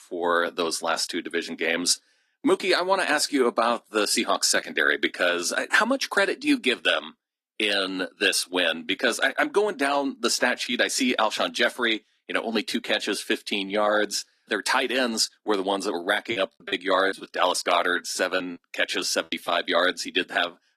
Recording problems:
thin; somewhat; fading below 250 Hz
garbled, watery; slightly; nothing above 15 kHz
choppy; very; from 16 to 19 s; 11% of the speech affected

